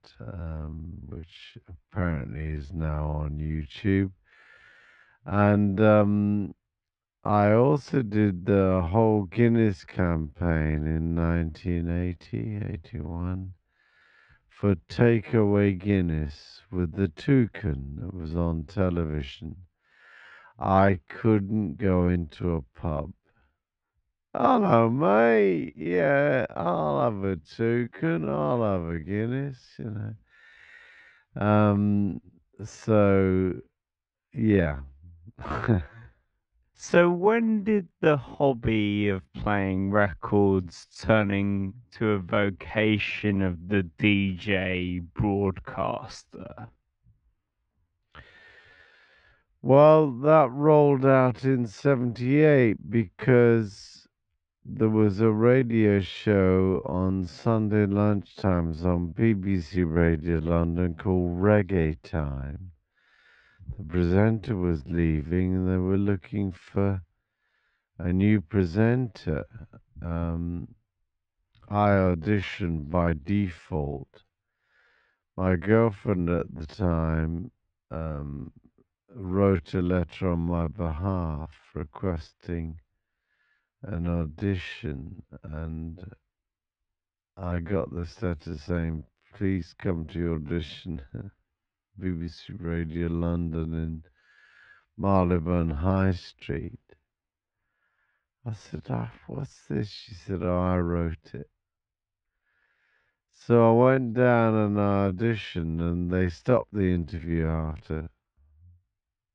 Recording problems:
muffled; very; fading above 2 kHz
wrong speed, natural pitch; too slow; 0.5 times normal speed

